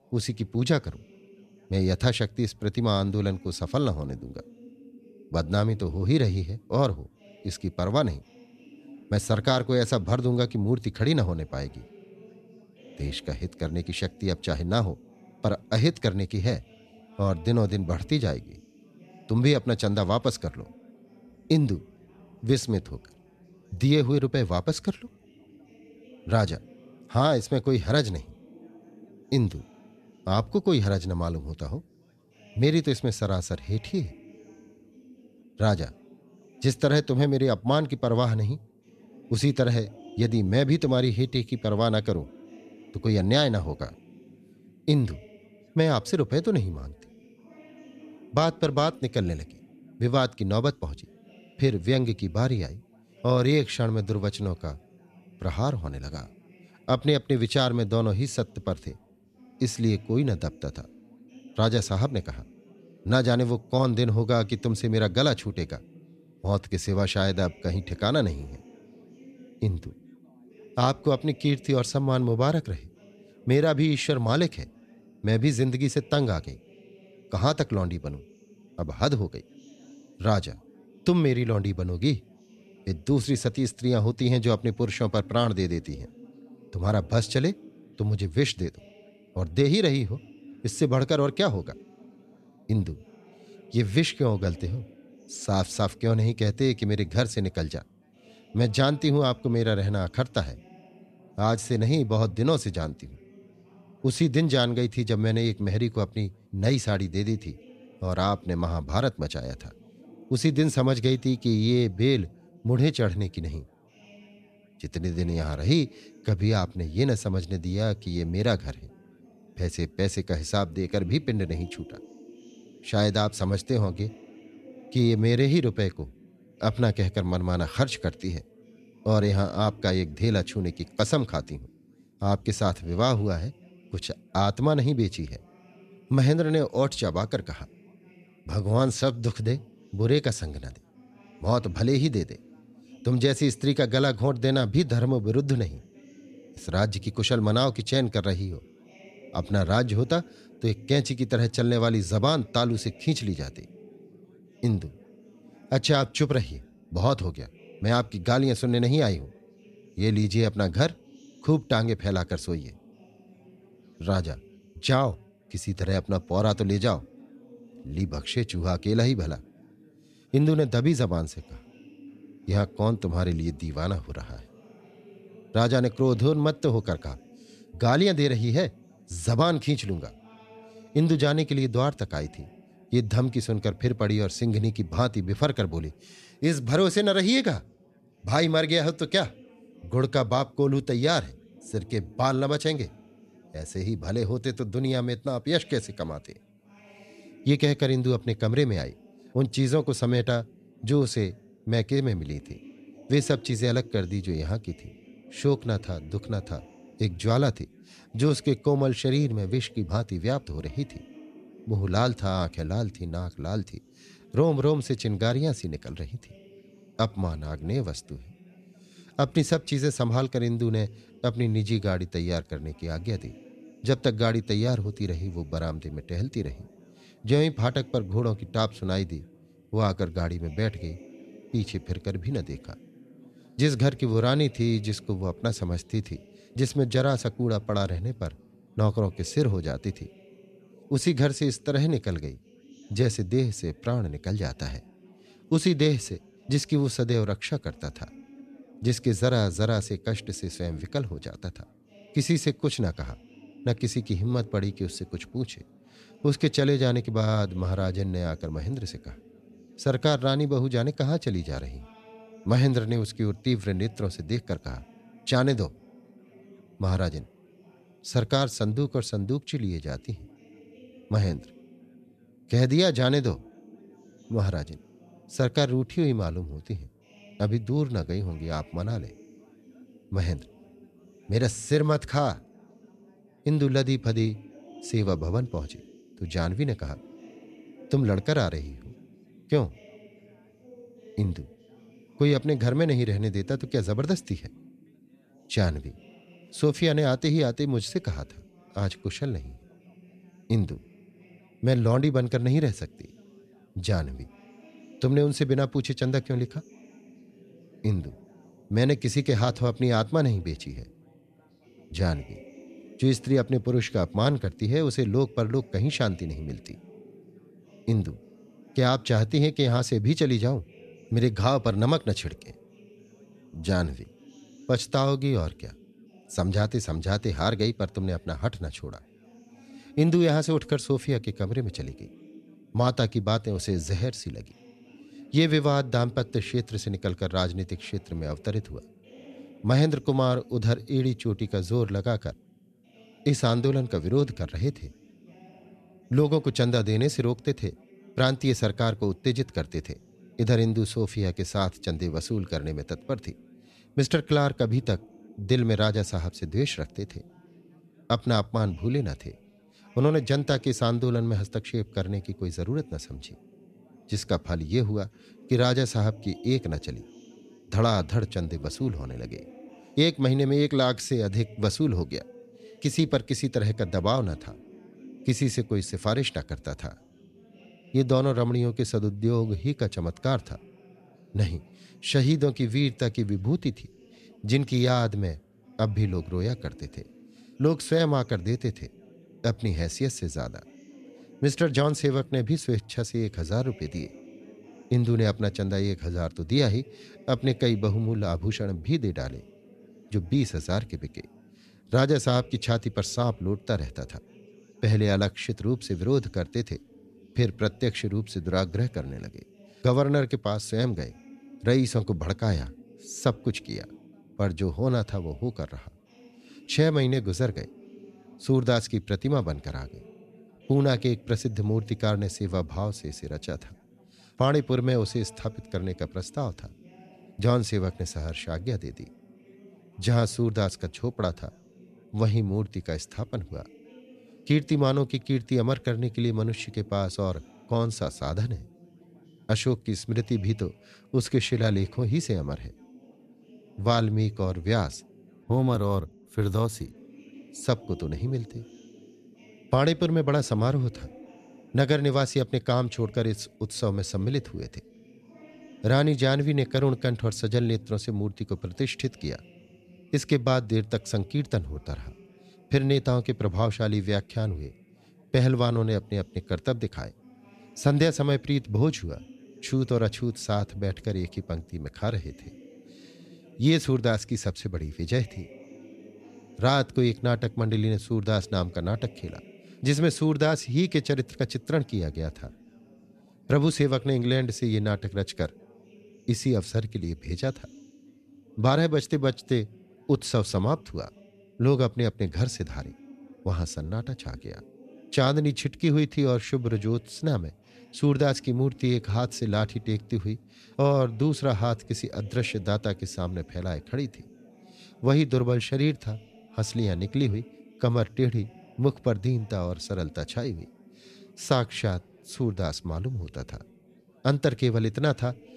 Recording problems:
background chatter; faint; throughout; 4 voices, 25 dB below the speech

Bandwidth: 14 kHz